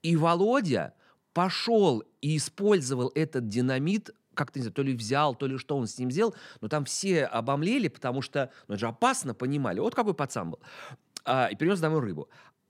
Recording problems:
none

